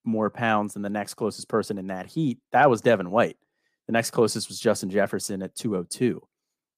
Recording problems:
none

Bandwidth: 15 kHz